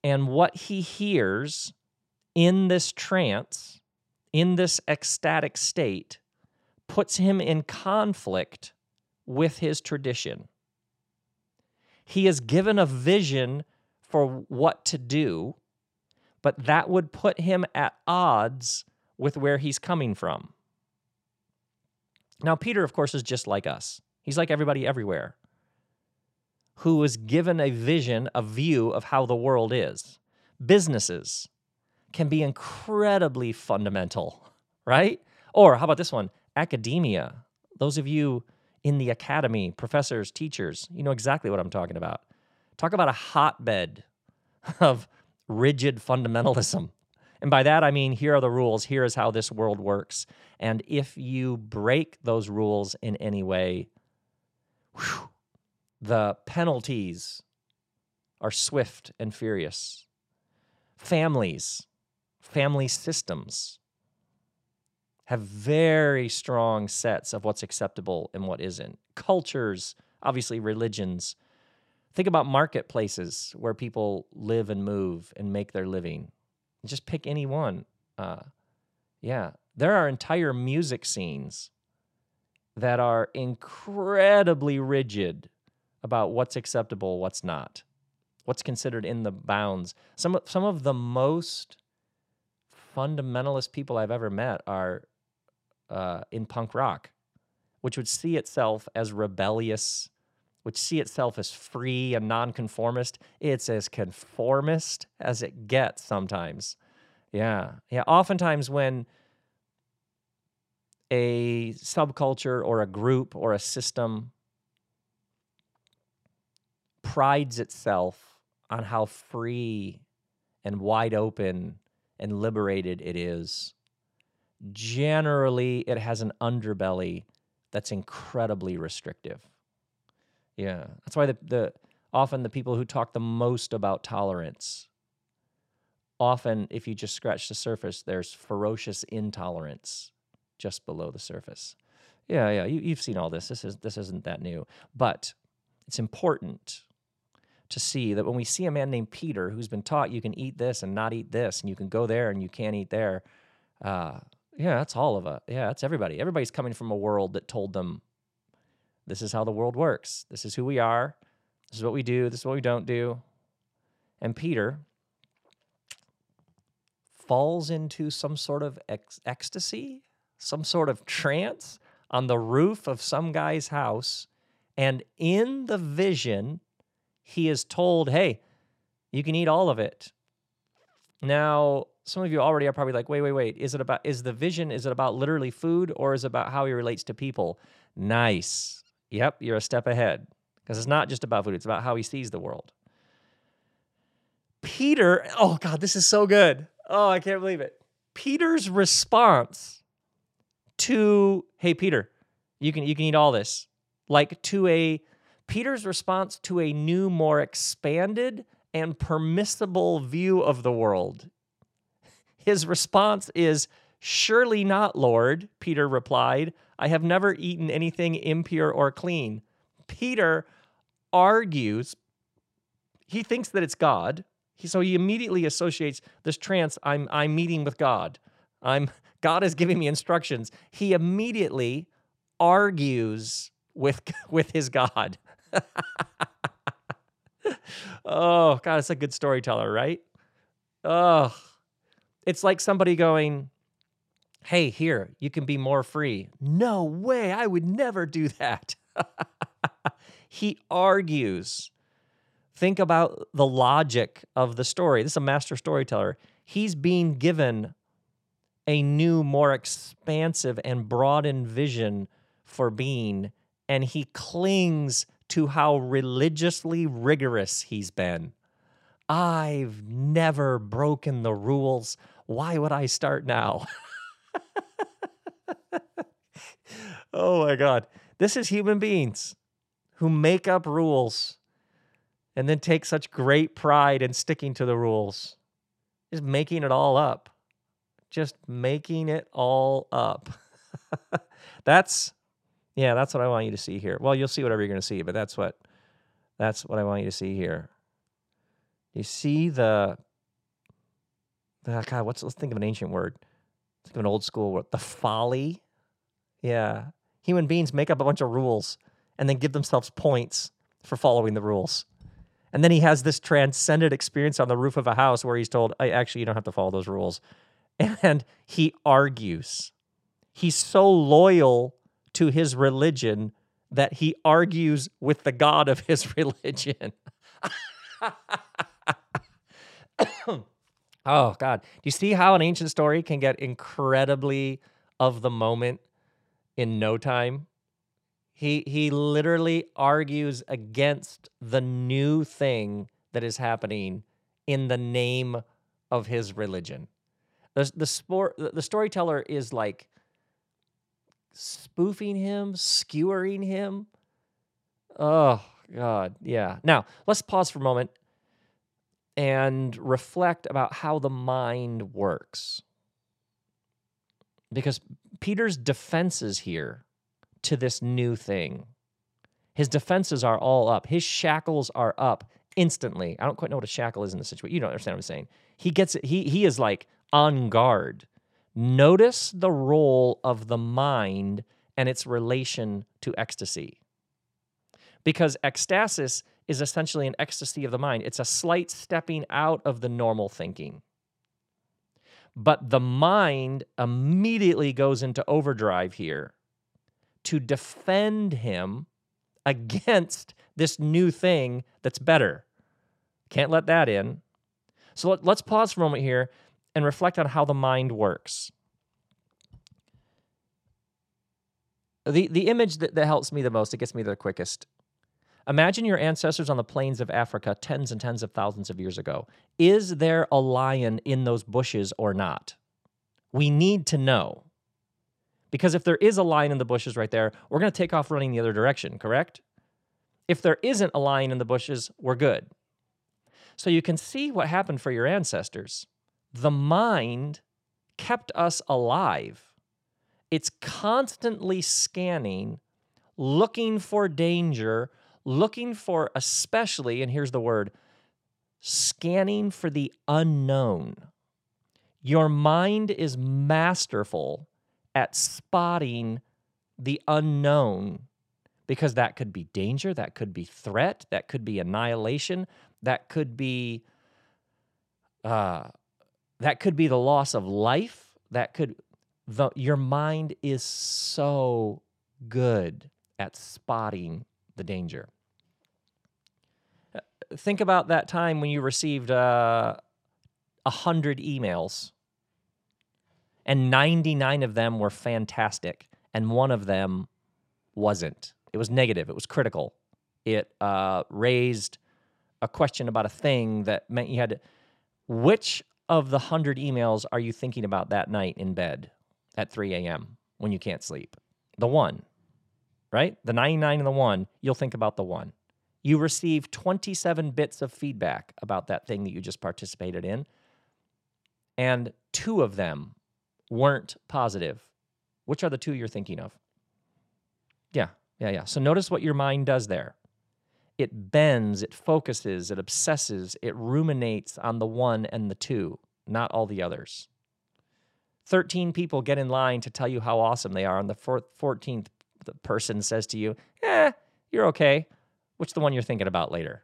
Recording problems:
none

